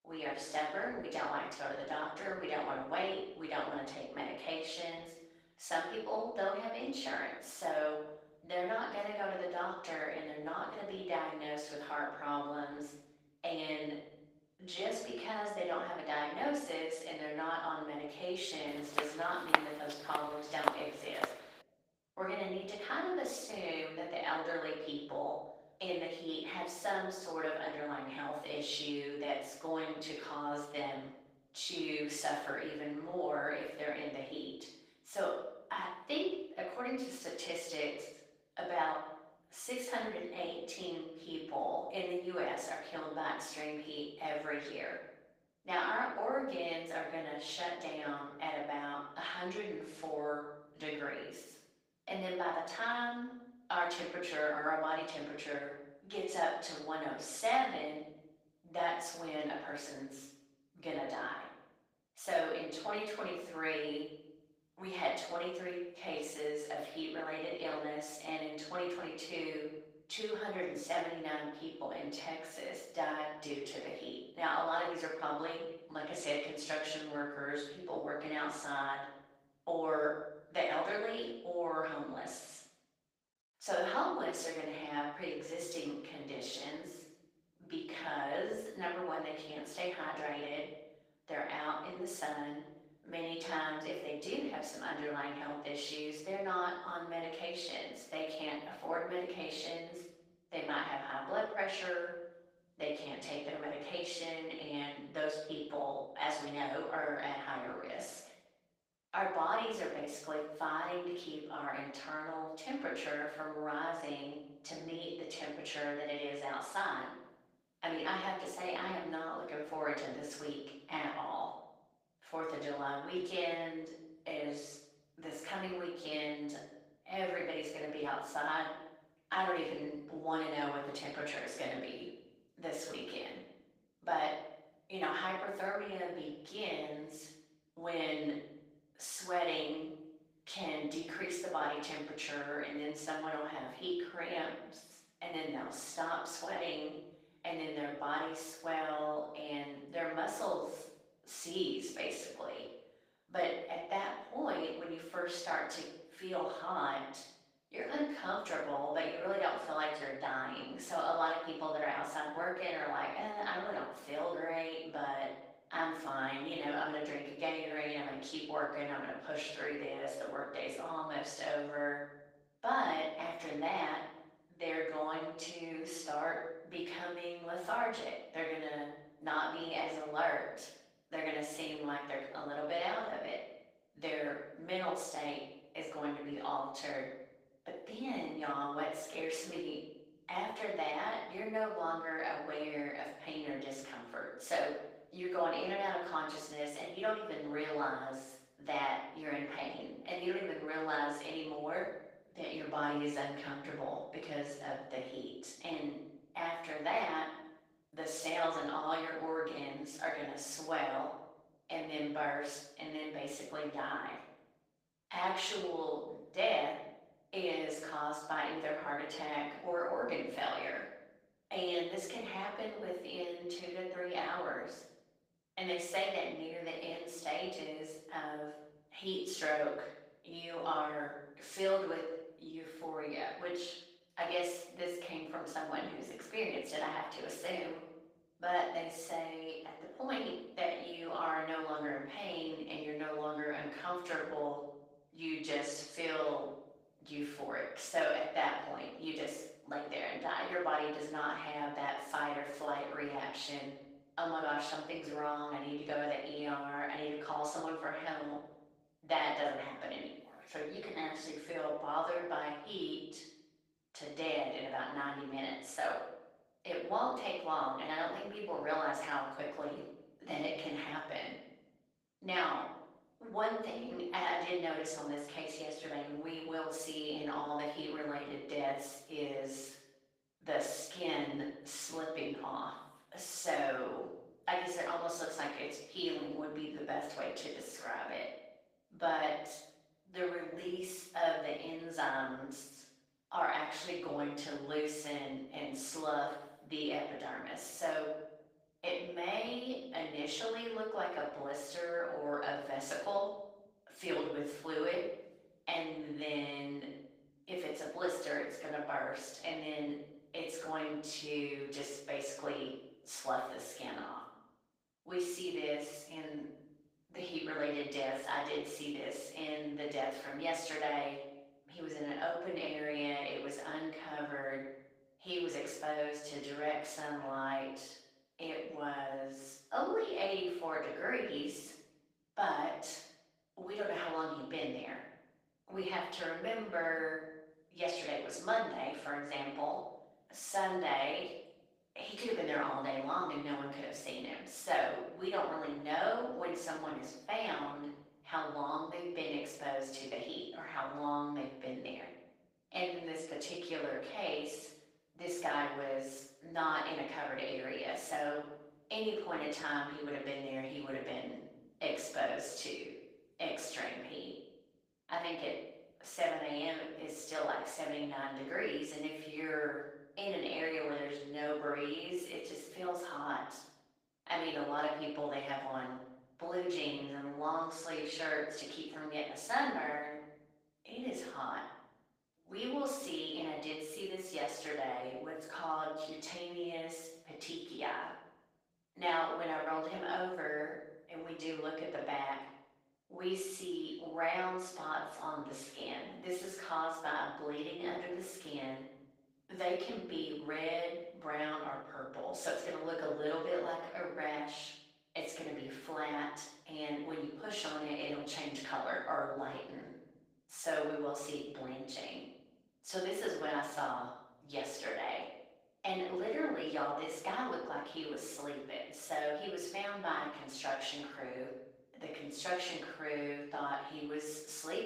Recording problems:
off-mic speech; far
room echo; noticeable; dies away in 0.8 s
thin; somewhat; fading below 600 Hz
garbled, watery; slightly; nothing above 15.5 kHz
footsteps; loud; from 19 to 21 s; peak 7 dB above the speech

